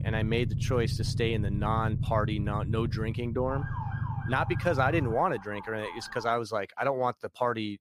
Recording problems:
low rumble; noticeable; until 5 s; 15 dB below the speech
siren; noticeable; from 3.5 to 6.5 s; peak 10 dB below the speech

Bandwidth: 15 kHz